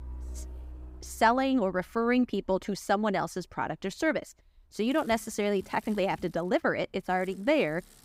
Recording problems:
traffic noise; faint; throughout; 20 dB below the speech

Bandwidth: 15.5 kHz